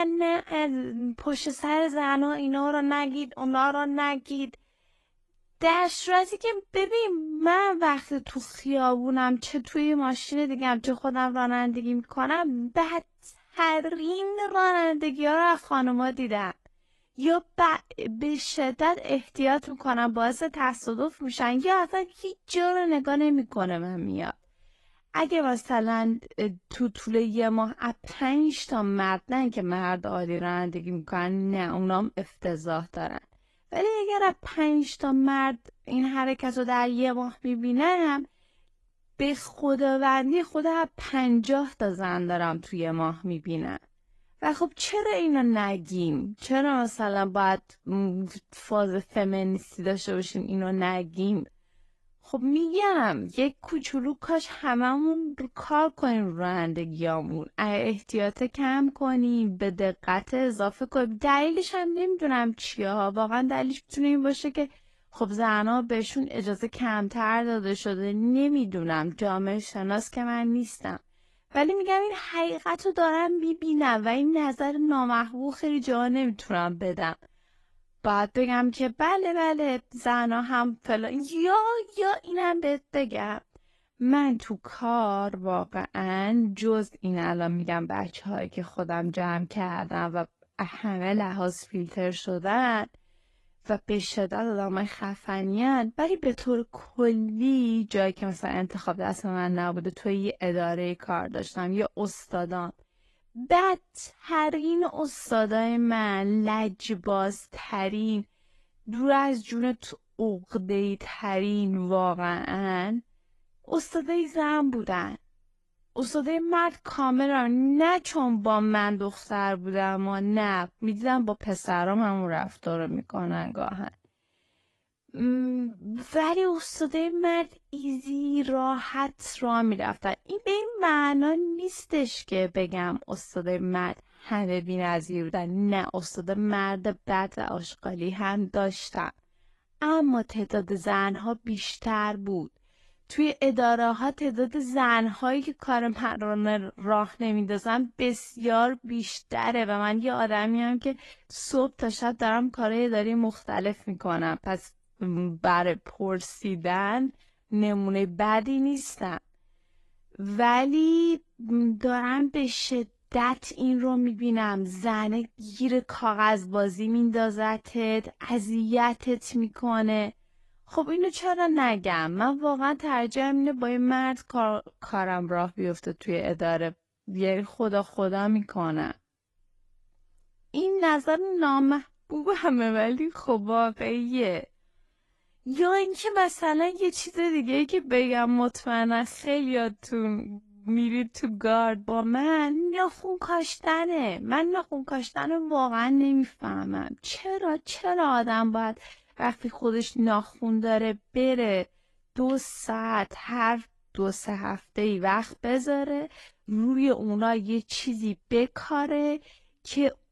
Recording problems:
wrong speed, natural pitch; too slow; 0.7 times normal speed
garbled, watery; slightly; nothing above 11.5 kHz
abrupt cut into speech; at the start

